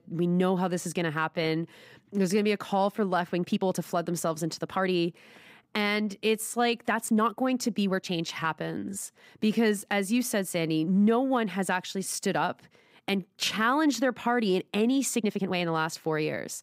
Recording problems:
uneven, jittery; strongly; from 1.5 to 16 s

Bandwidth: 15.5 kHz